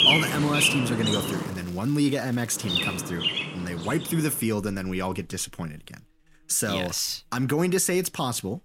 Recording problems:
animal sounds; very loud; throughout; 1 dB above the speech
crackling; faint; from 1.5 to 3 s and at 6.5 s; 25 dB below the speech

